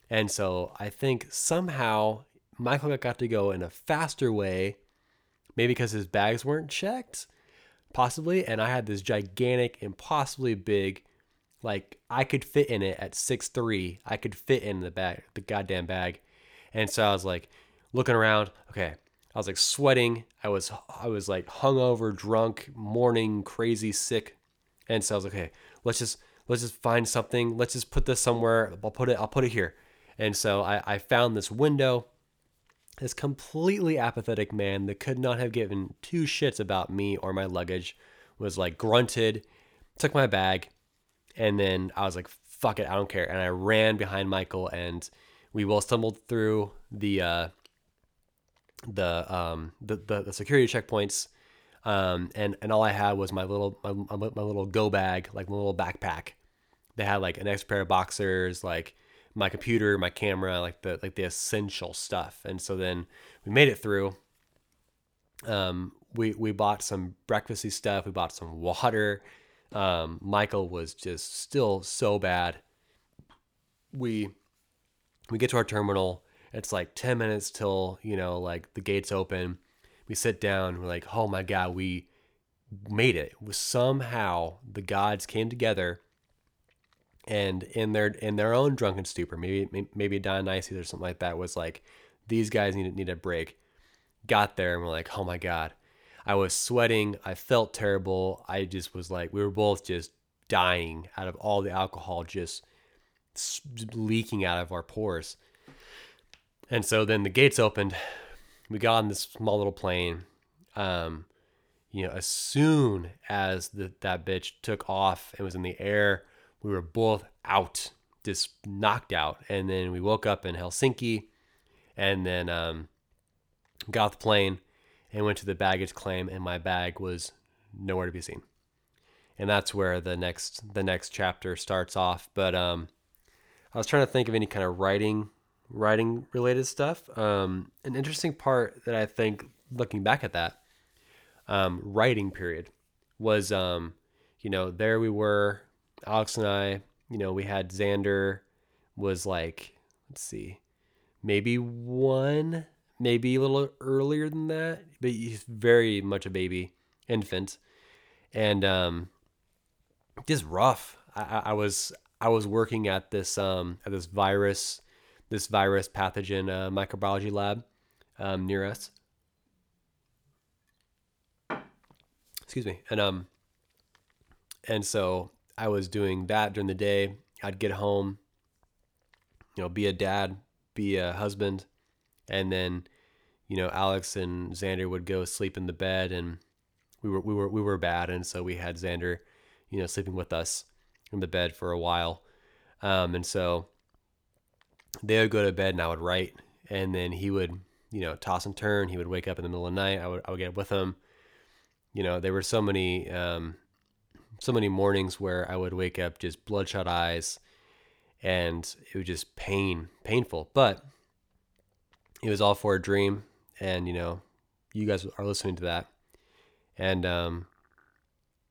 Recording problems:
none

